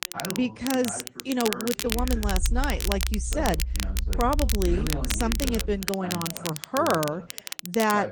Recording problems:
garbled, watery; slightly; nothing above 9.5 kHz
crackle, like an old record; loud; 5 dB below the speech
background chatter; noticeable; throughout; 2 voices, 10 dB below the speech
low rumble; faint; from 2 to 5.5 s; 20 dB below the speech

